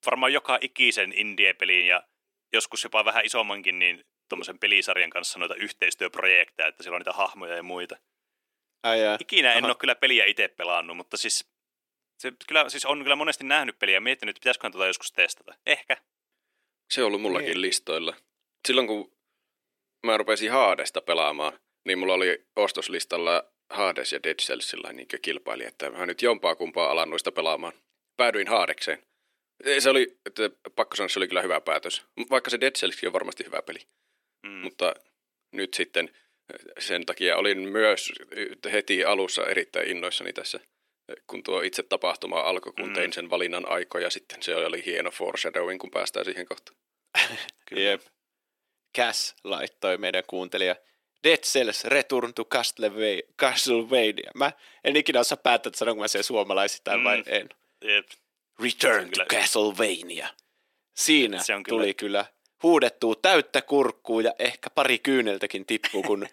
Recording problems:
thin; somewhat; fading below 300 Hz

